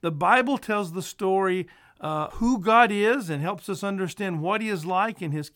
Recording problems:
none

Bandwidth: 17 kHz